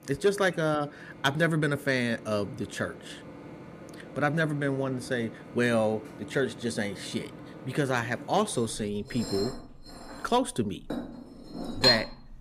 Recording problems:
household noises; loud; throughout; 6 dB below the speech

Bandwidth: 15 kHz